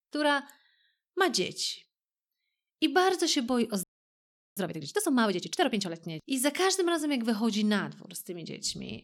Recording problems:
audio freezing; at 4 s for 0.5 s

